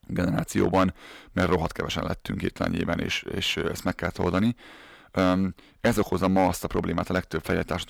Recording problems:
distortion; slight; 3% of the sound clipped

